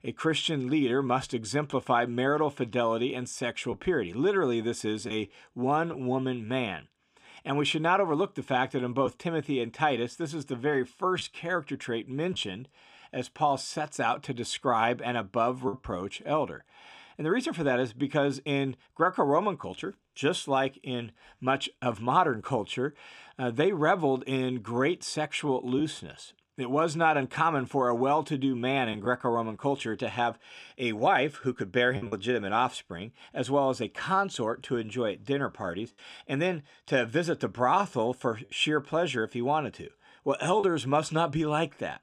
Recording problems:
choppy; occasionally; 1% of the speech affected

